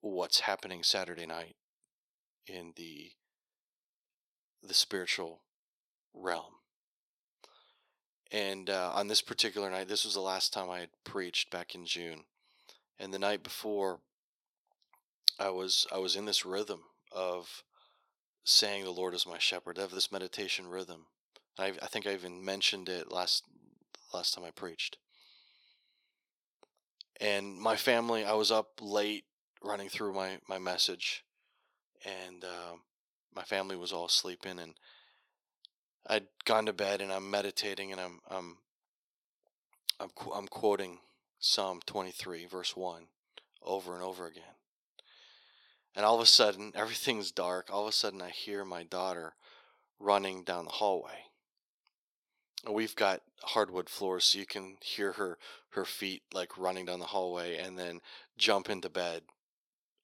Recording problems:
thin; somewhat; fading below 450 Hz

